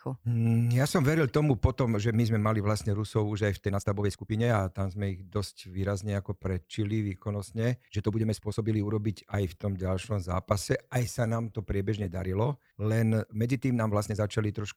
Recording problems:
uneven, jittery; strongly; from 3.5 to 14 s

